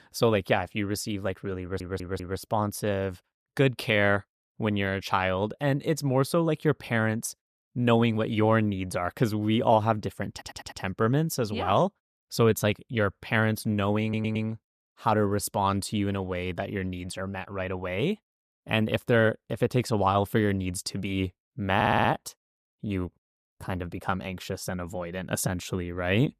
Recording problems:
audio stuttering; 4 times, first at 1.5 s

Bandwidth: 14.5 kHz